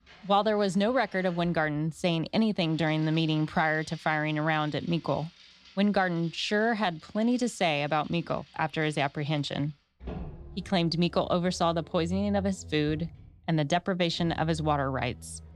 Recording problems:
traffic noise; faint; throughout; 20 dB below the speech

